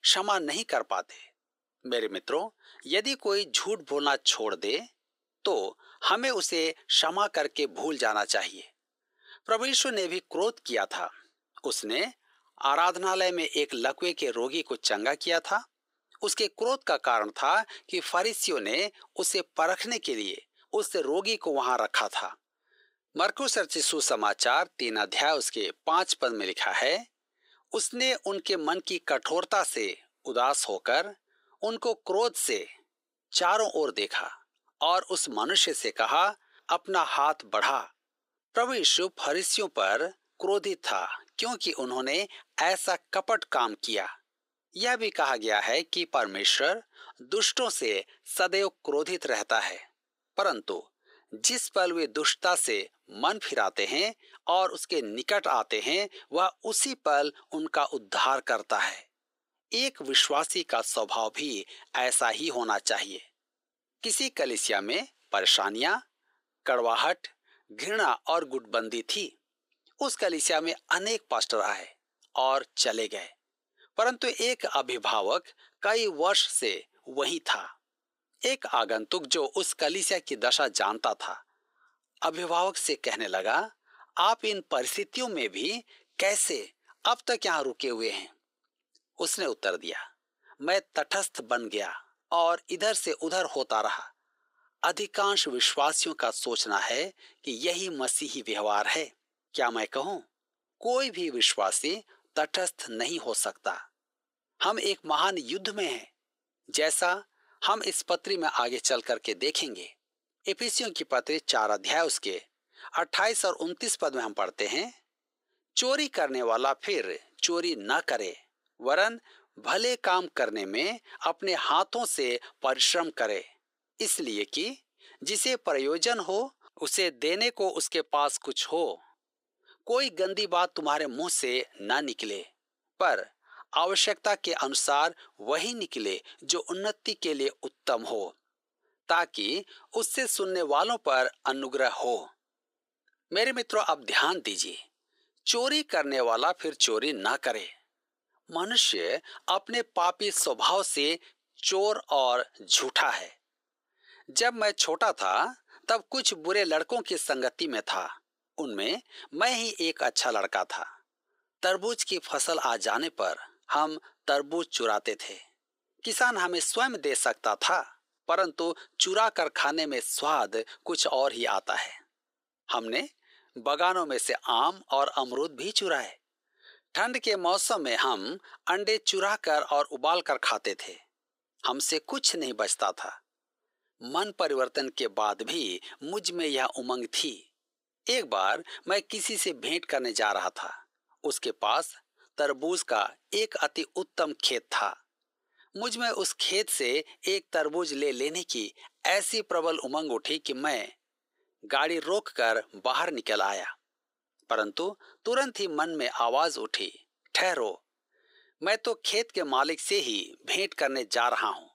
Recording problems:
thin; very; fading below 400 Hz

